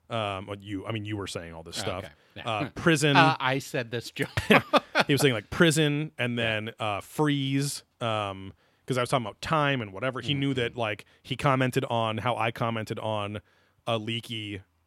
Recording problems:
none

